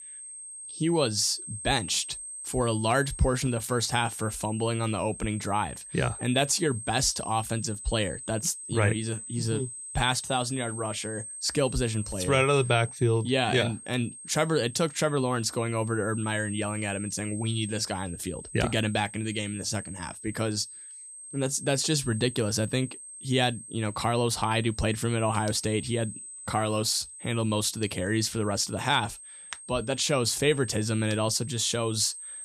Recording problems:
high-pitched whine; noticeable; throughout; 8.5 kHz, 10 dB below the speech

